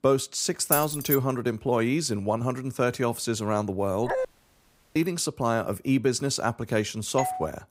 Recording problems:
jangling keys; loud; at 0.5 s; peak 1 dB above the speech
dog barking; noticeable; at 4 s; peak 3 dB below the speech
audio cutting out; at 4.5 s for 0.5 s
doorbell; noticeable; at 7 s; peak 5 dB below the speech

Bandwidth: 15.5 kHz